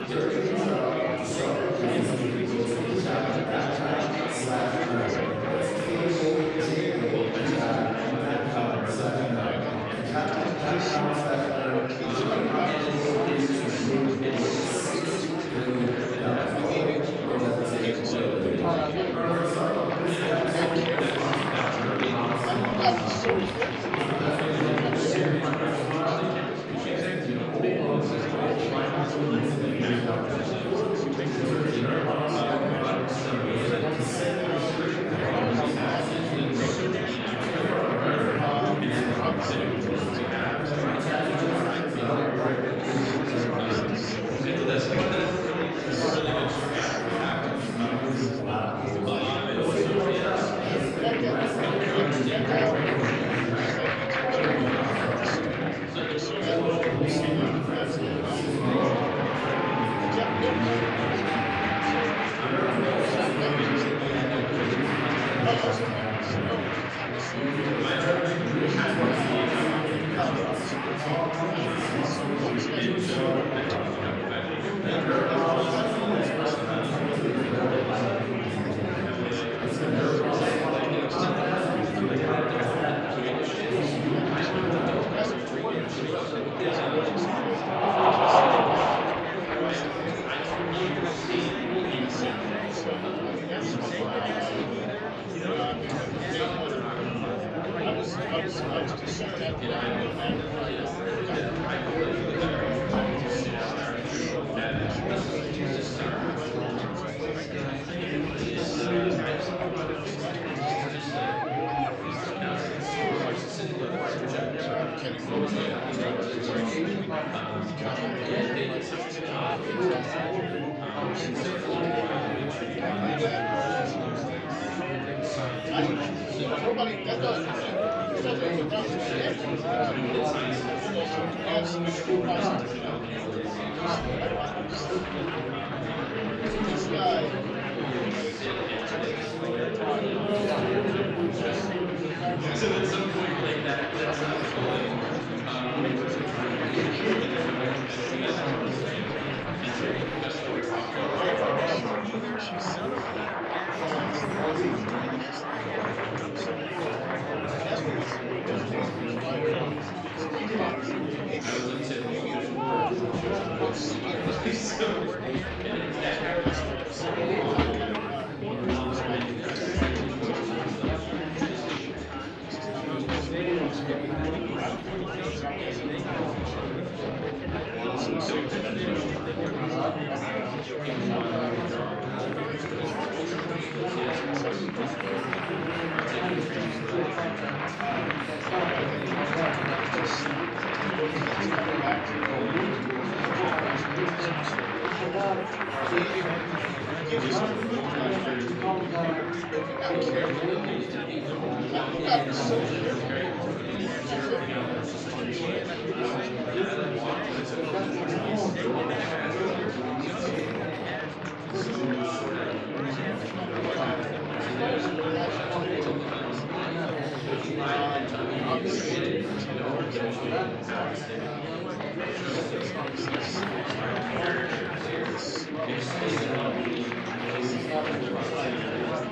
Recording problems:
room echo; strong; dies away in 2.2 s
off-mic speech; far
chatter from many people; very loud; throughout; 2 dB above the speech

